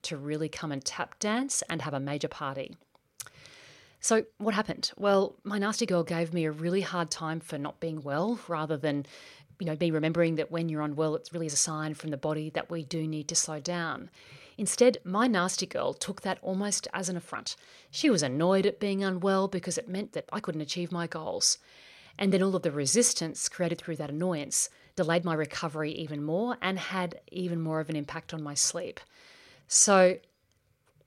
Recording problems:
uneven, jittery; strongly; from 1 to 30 s

